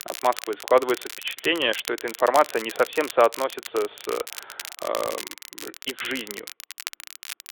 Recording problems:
phone-call audio
crackle, like an old record; noticeable; 10 dB below the speech

